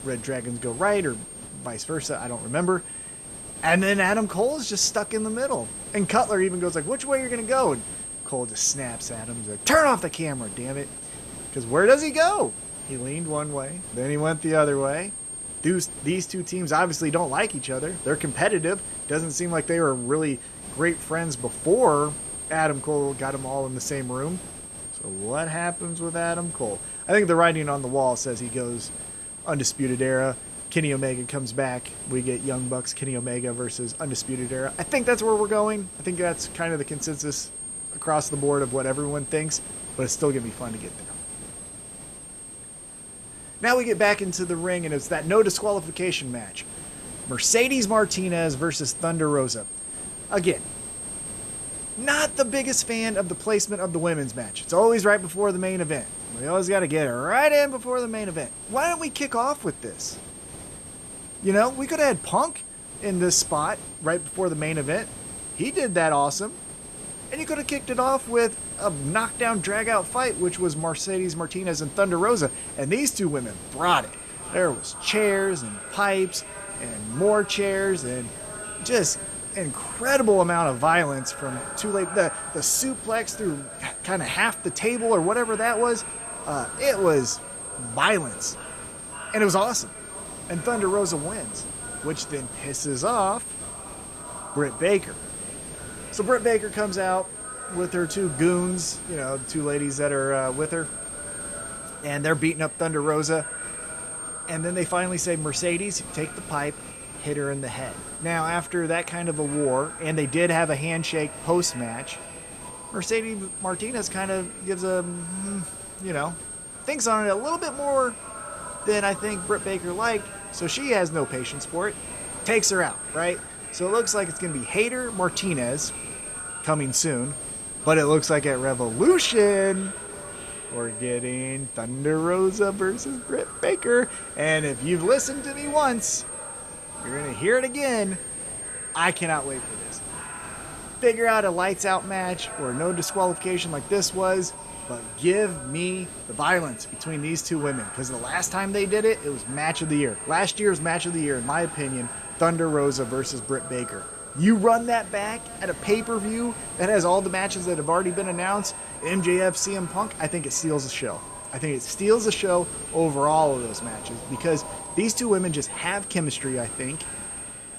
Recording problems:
echo of what is said; faint; from 1:14 on; 550 ms later, 20 dB below the speech
high-pitched whine; loud; throughout; 8.5 kHz, 10 dB below the speech
hiss; noticeable; throughout; 20 dB below the speech

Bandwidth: 13.5 kHz